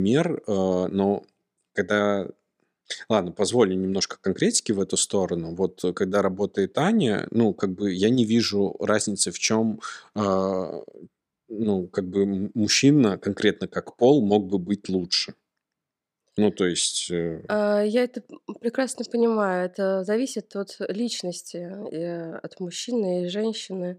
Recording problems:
abrupt cut into speech; at the start

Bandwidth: 15 kHz